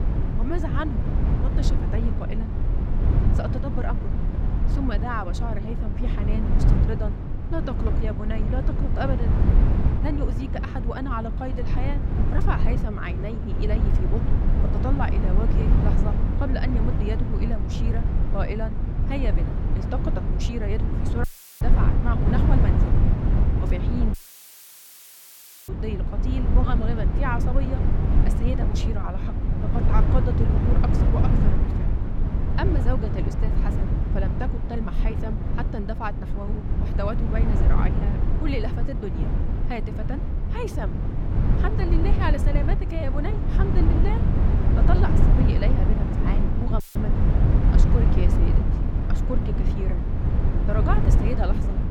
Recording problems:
low rumble; loud; throughout; 1 dB below the speech
audio cutting out; filled with static; at 21 s, at 24 s for 1.5 s and at 47 s

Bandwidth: 17 kHz